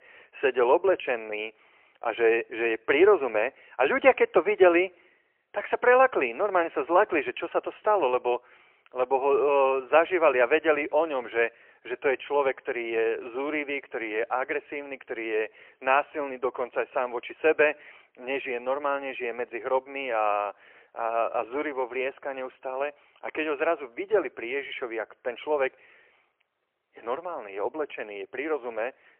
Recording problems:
phone-call audio; poor line

